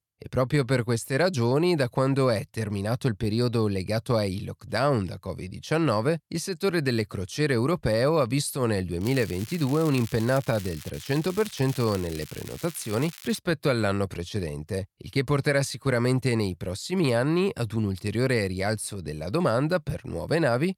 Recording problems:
crackling; noticeable; from 9 to 11 s and from 11 to 13 s; 15 dB below the speech

